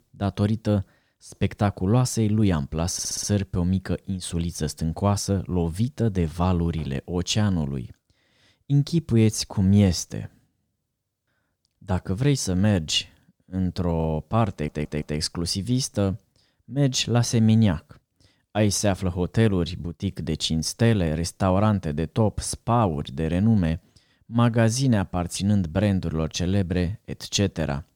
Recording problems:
audio stuttering; at 3 s and at 15 s

